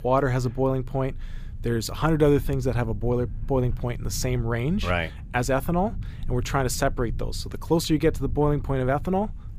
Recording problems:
low rumble; faint; throughout; 25 dB below the speech

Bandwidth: 15 kHz